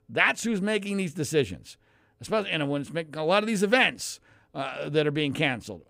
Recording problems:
none

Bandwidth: 15.5 kHz